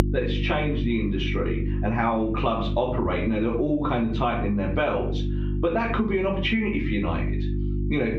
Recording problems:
off-mic speech; far
muffled; slightly; fading above 3.5 kHz
room echo; slight; dies away in 0.3 s
squashed, flat; somewhat
electrical hum; noticeable; throughout; 50 Hz, 15 dB below the speech

